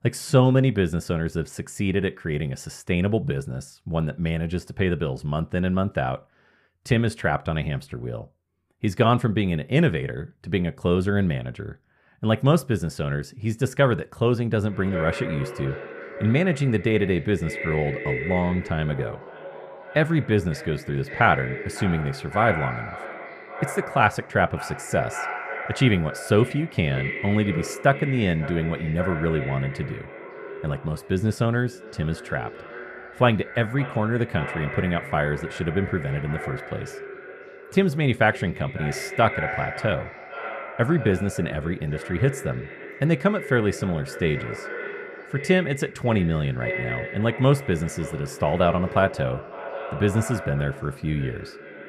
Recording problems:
echo of what is said; strong; from 15 s on; 550 ms later, 10 dB below the speech

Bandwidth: 15 kHz